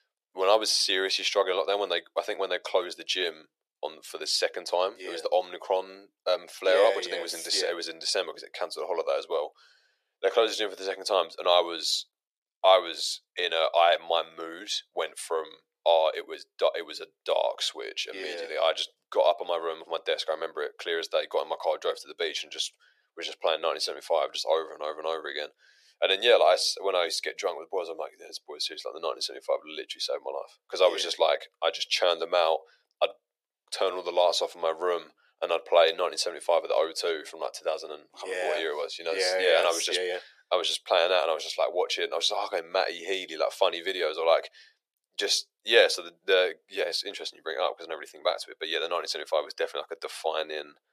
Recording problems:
thin; very; fading below 400 Hz

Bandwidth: 14.5 kHz